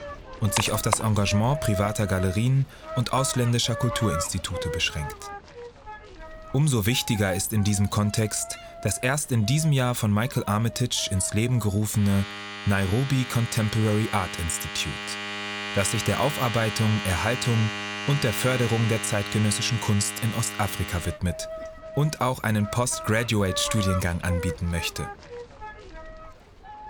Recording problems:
household noises; loud; throughout; 9 dB below the speech

